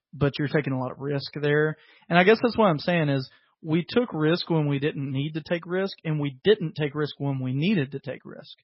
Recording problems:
garbled, watery; badly; nothing above 5.5 kHz

